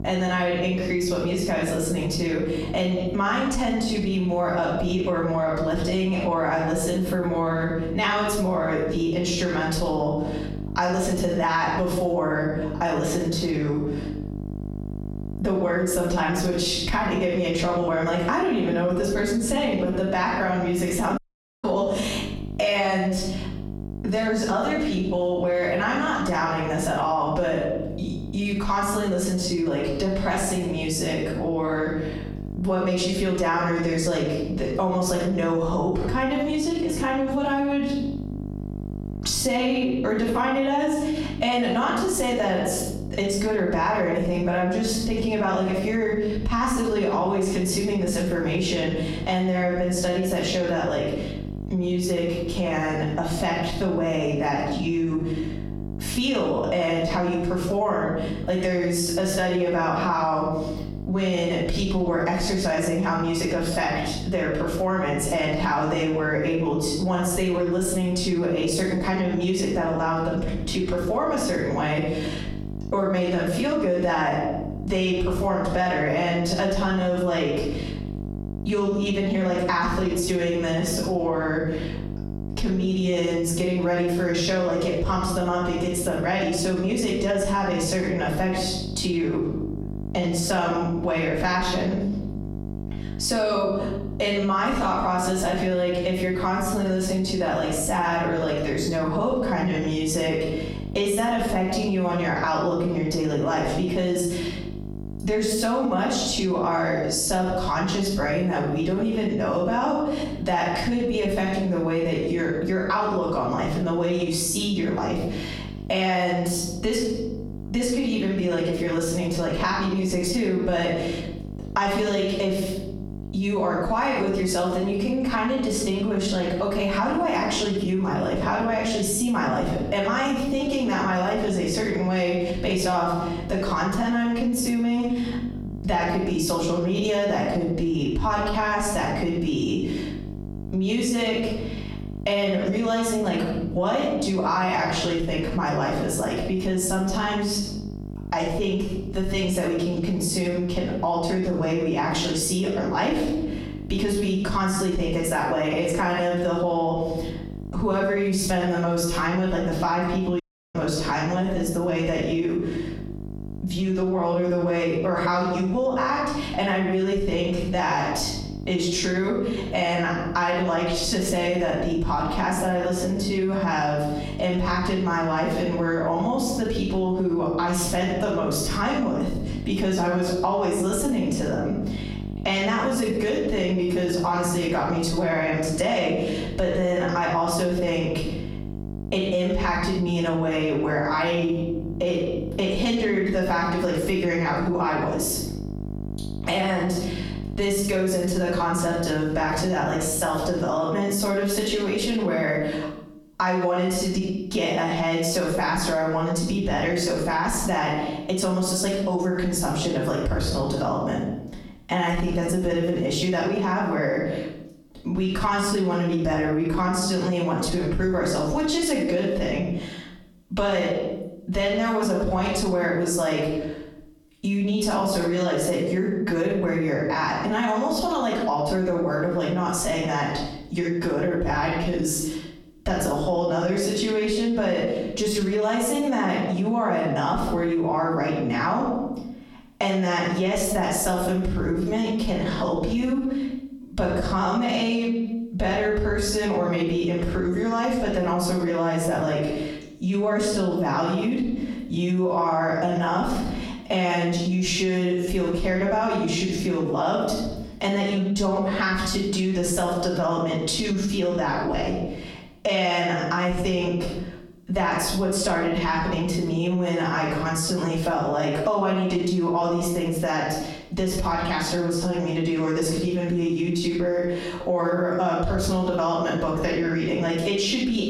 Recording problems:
off-mic speech; far
room echo; noticeable; dies away in 0.7 s
squashed, flat; somewhat
electrical hum; faint; until 3:21; 50 Hz, 20 dB below the speech
audio cutting out; at 21 s and at 2:40

